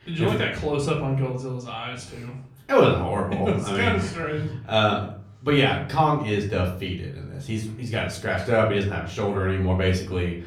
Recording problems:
off-mic speech; far
room echo; slight; dies away in 0.4 s

